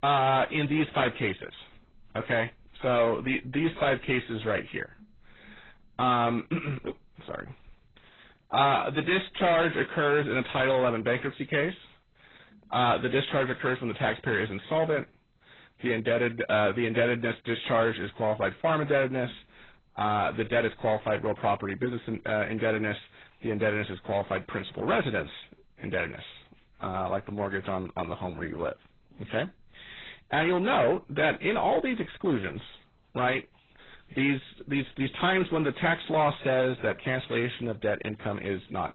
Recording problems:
distortion; heavy; 8 dB below the speech
garbled, watery; badly; nothing above 4 kHz

